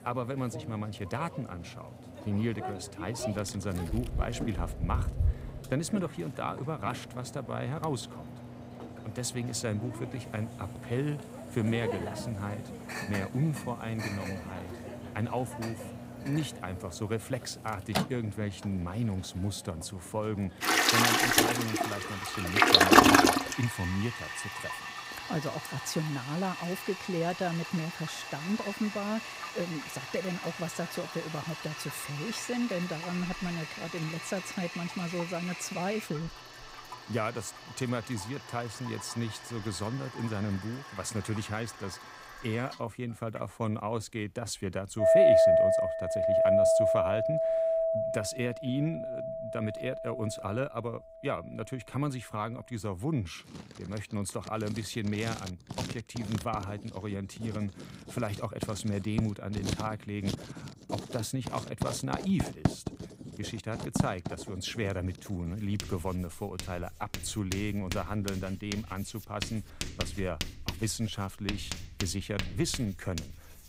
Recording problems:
household noises; very loud; throughout; 4 dB above the speech

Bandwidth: 15.5 kHz